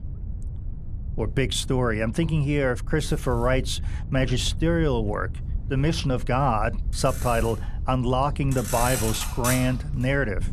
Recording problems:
traffic noise; loud; throughout; 7 dB below the speech
wind noise on the microphone; occasional gusts; 20 dB below the speech

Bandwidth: 14.5 kHz